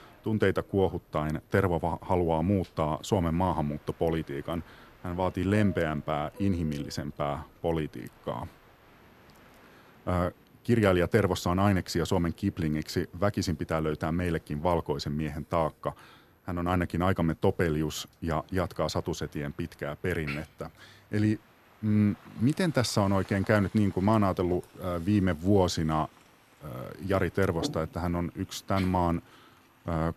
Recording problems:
train or aircraft noise; faint; throughout; 25 dB below the speech

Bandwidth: 14 kHz